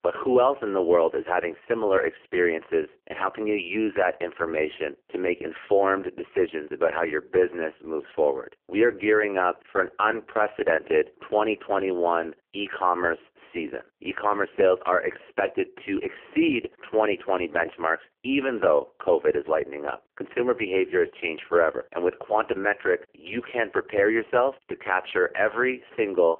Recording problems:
phone-call audio; poor line; nothing above 3 kHz

